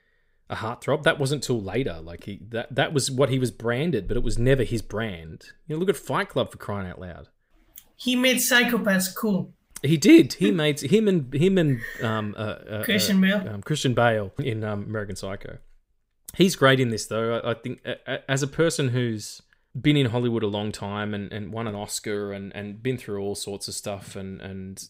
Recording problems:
none

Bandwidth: 15.5 kHz